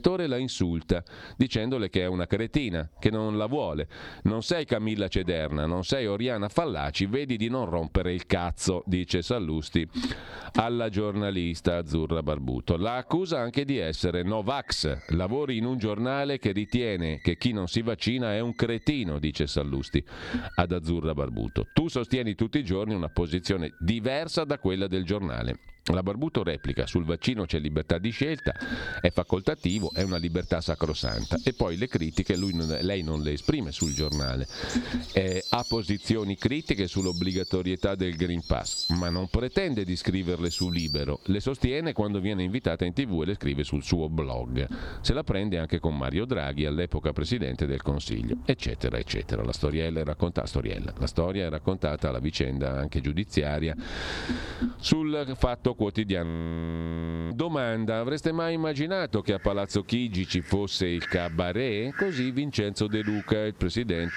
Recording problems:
squashed, flat; somewhat, background pumping
animal sounds; noticeable; throughout; 10 dB below the speech
audio freezing; at 56 s for 1 s

